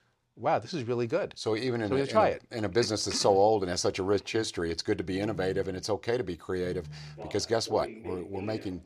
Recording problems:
alarms or sirens; noticeable; from 5 s on; 15 dB below the speech

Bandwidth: 15 kHz